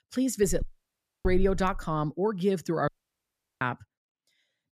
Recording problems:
door banging; noticeable; until 2 s; peak 7 dB below the speech
audio cutting out; at 0.5 s for 0.5 s and at 3 s for 0.5 s

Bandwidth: 14.5 kHz